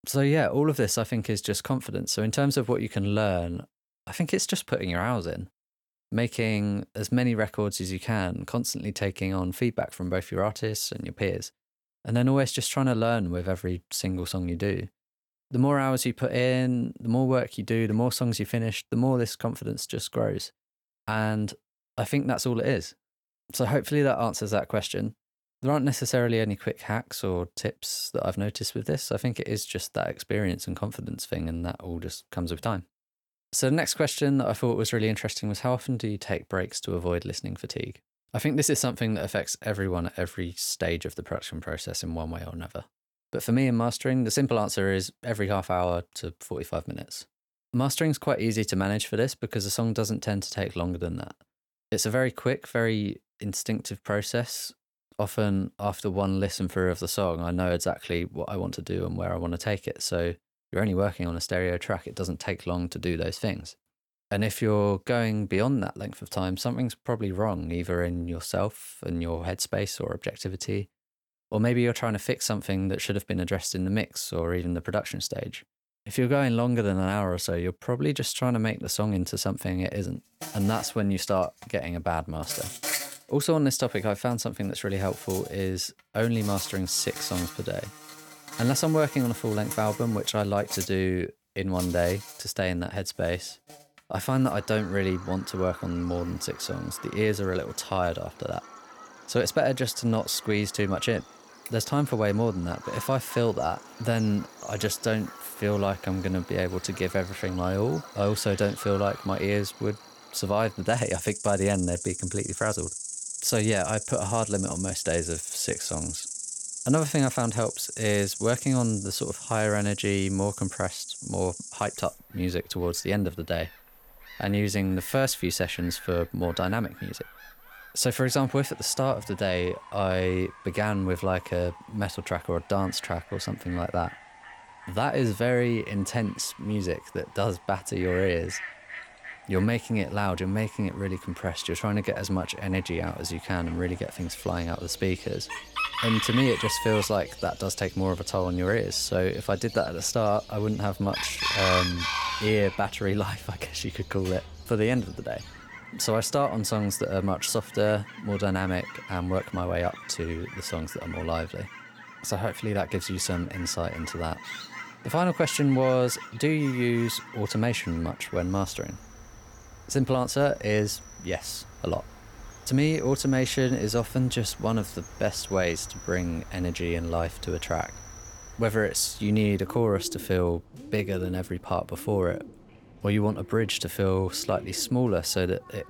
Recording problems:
animal sounds; noticeable; from 1:20 on; 10 dB below the speech

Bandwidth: 18.5 kHz